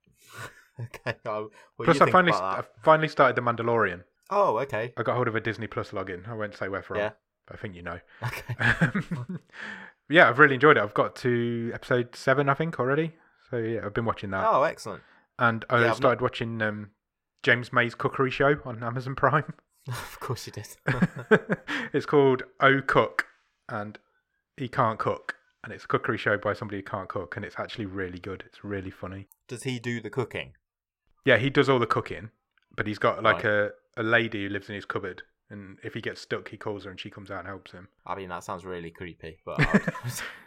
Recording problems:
muffled; slightly; fading above 3 kHz

